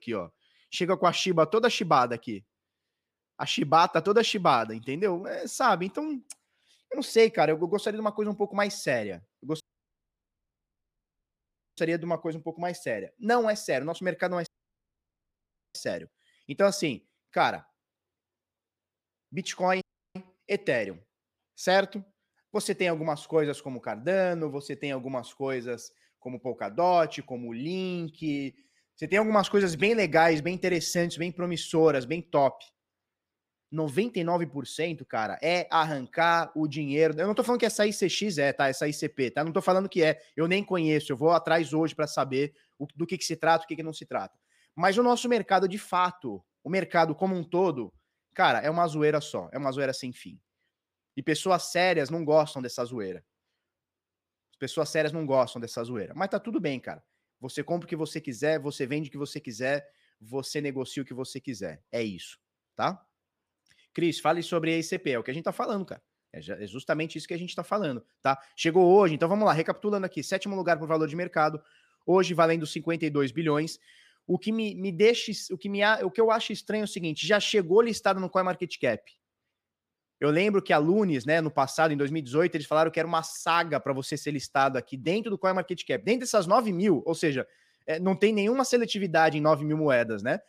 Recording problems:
audio cutting out; at 9.5 s for 2 s, at 14 s for 1.5 s and at 20 s

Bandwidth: 15 kHz